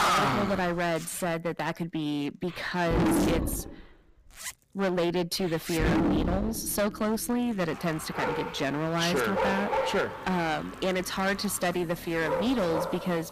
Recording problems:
distortion; heavy; 18% of the sound clipped
animal sounds; loud; throughout; as loud as the speech
household noises; noticeable; throughout; 15 dB below the speech

